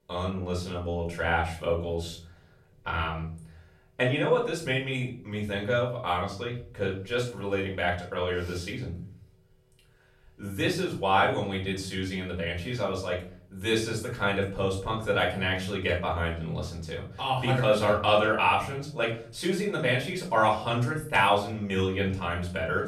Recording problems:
off-mic speech; far
room echo; slight; dies away in 0.5 s

